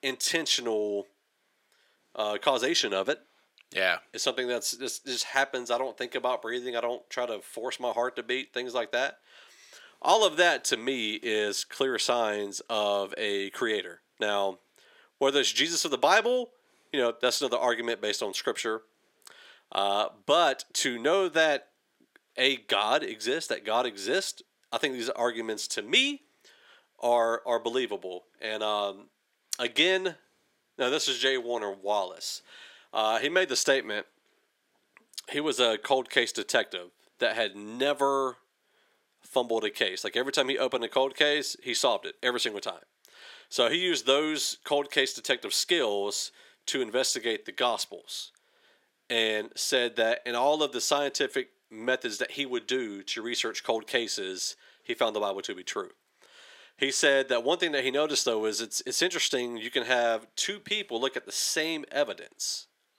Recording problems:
thin; somewhat; fading below 350 Hz

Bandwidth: 16 kHz